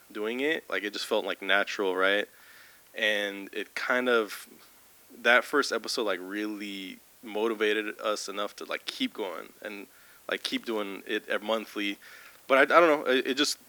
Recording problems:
thin; somewhat; fading below 250 Hz
hiss; faint; throughout; 25 dB below the speech
crackling; faint; at 10 s; 30 dB below the speech

